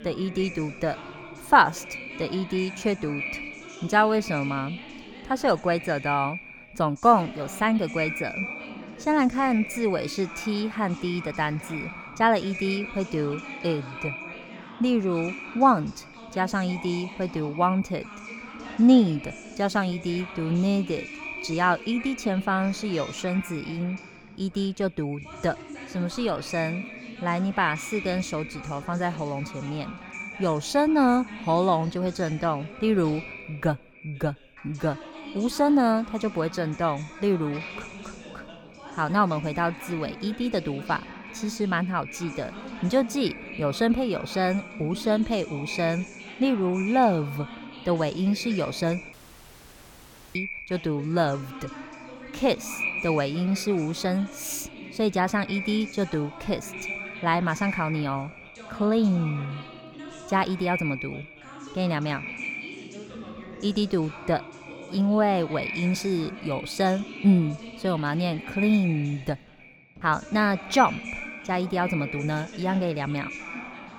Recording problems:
echo of what is said; noticeable; throughout; 110 ms later, 10 dB below the speech
background chatter; noticeable; throughout; 2 voices, 15 dB below the speech
audio cutting out; at 49 s for 1 s

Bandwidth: 18 kHz